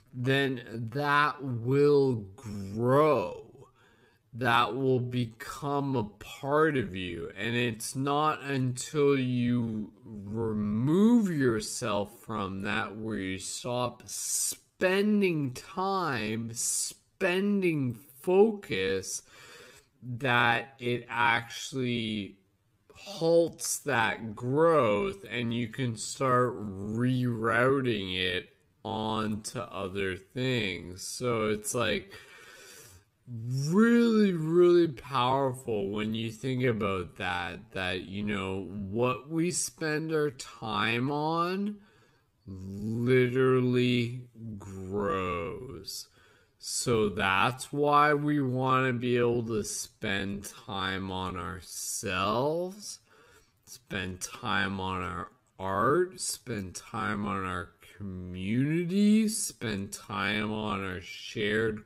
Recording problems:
wrong speed, natural pitch; too slow; 0.5 times normal speed

